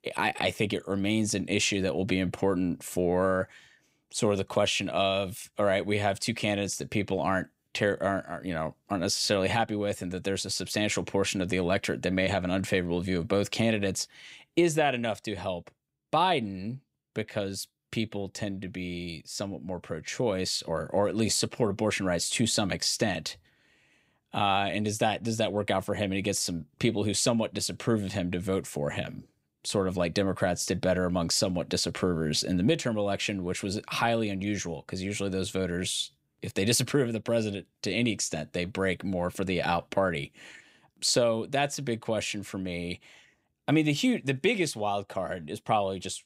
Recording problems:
none

